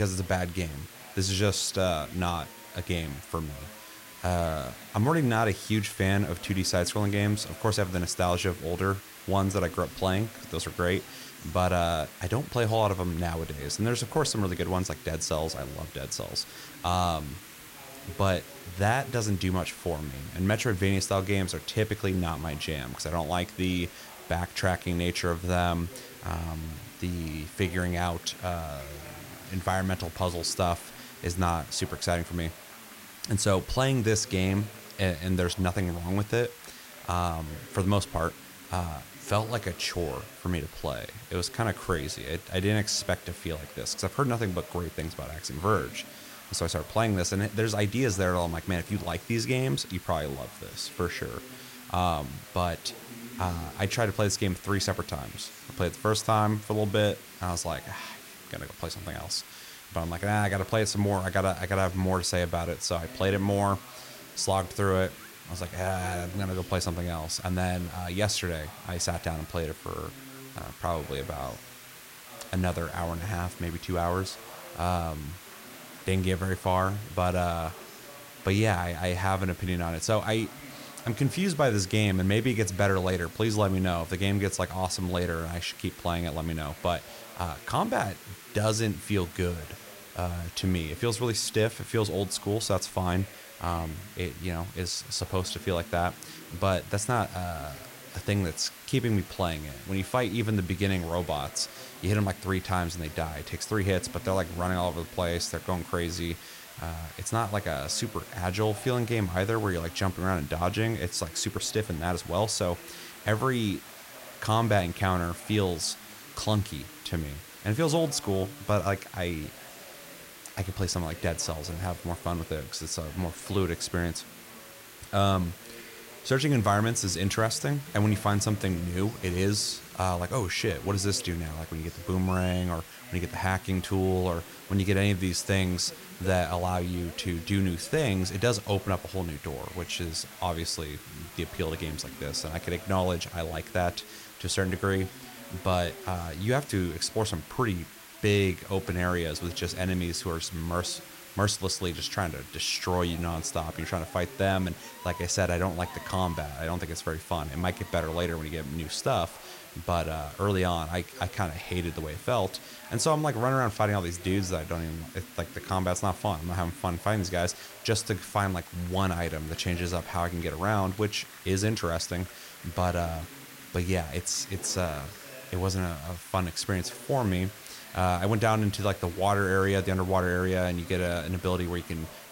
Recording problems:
chatter from many people; noticeable; throughout; 20 dB below the speech
hiss; noticeable; throughout; 15 dB below the speech
abrupt cut into speech; at the start

